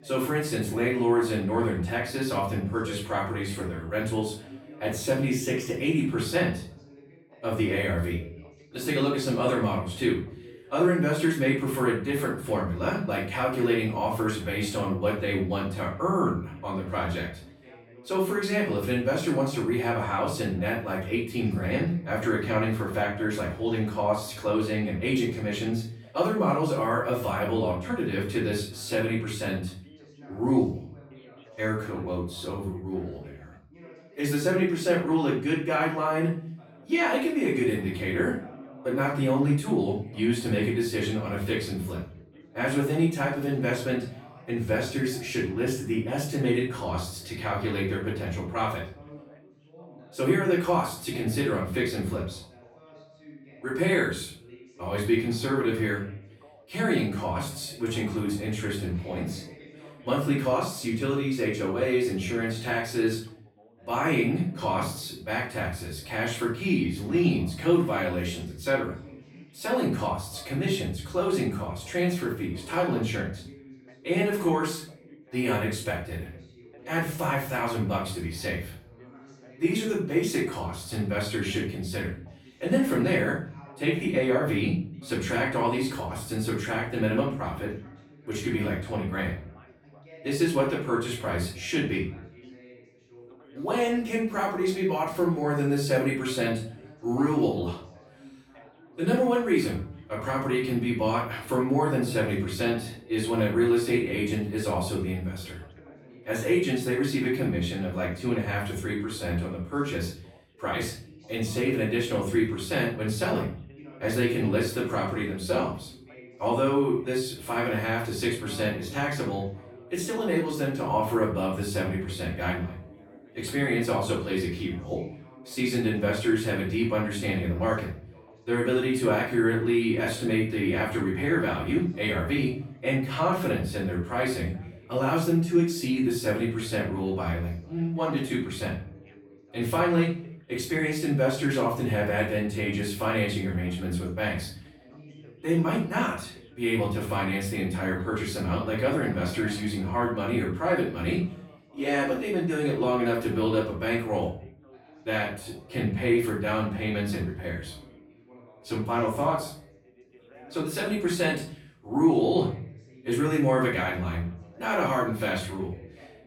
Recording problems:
off-mic speech; far
room echo; noticeable; dies away in 0.5 s
background chatter; faint; throughout; 2 voices, 25 dB below the speech

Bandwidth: 17 kHz